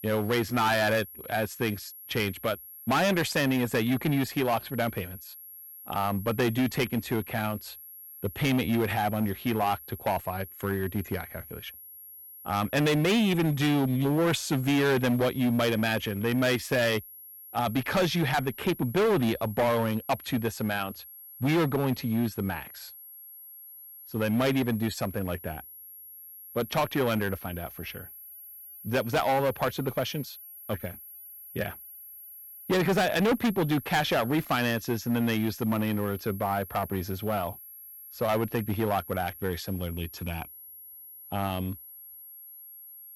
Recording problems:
distortion; heavy; 9% of the sound clipped
high-pitched whine; noticeable; throughout; 11.5 kHz, 15 dB below the speech

